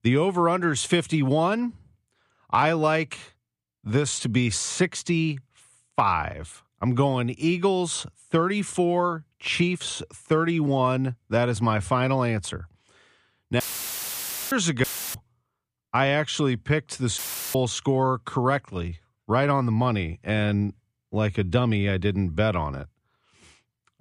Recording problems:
audio cutting out; filled with static; at 14 s for 1 s, at 15 s and at 17 s

